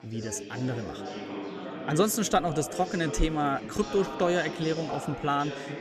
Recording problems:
chatter from many people; loud; throughout; 9 dB below the speech

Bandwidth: 13.5 kHz